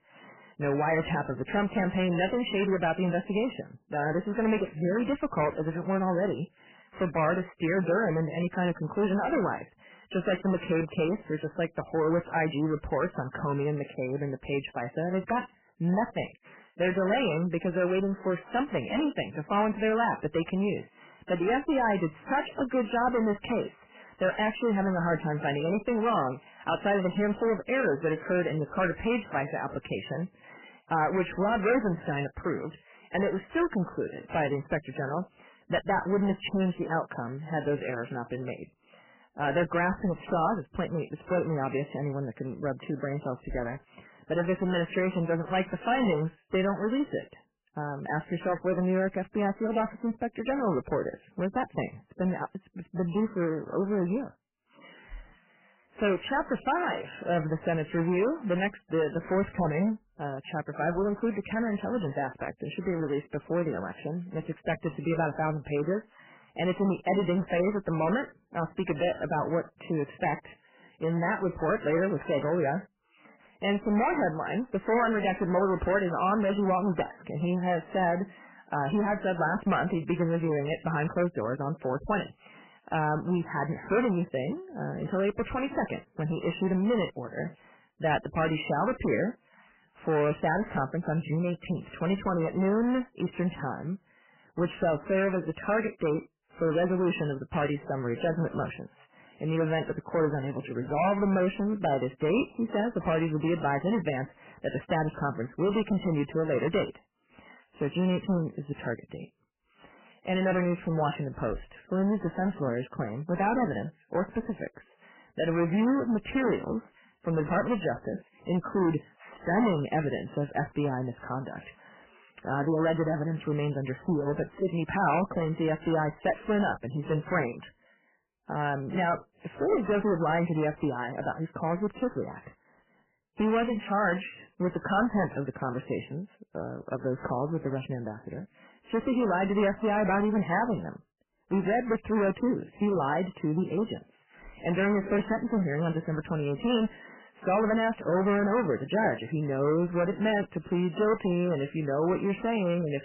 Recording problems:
distortion; heavy; 10% of the sound clipped
garbled, watery; badly; nothing above 3 kHz

